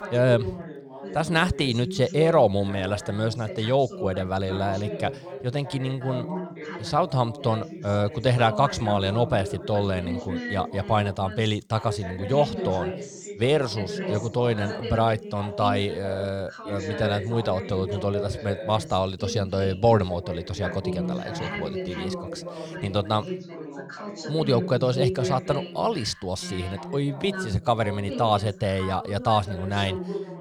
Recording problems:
background chatter; loud; throughout; 2 voices, 9 dB below the speech

